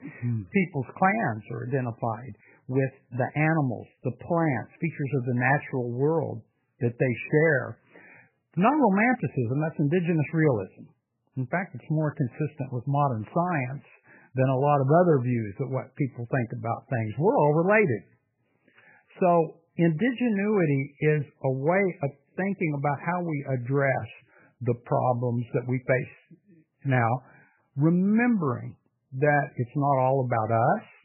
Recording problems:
garbled, watery; badly; nothing above 2.5 kHz

